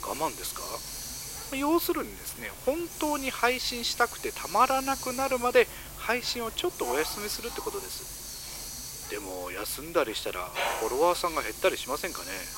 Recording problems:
thin; very; fading below 350 Hz
hiss; loud; throughout; 9 dB below the speech
household noises; noticeable; throughout; 10 dB below the speech

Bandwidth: 16 kHz